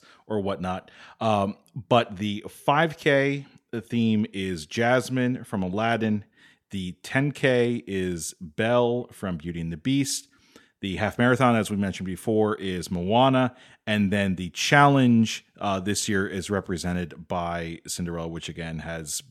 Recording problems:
none

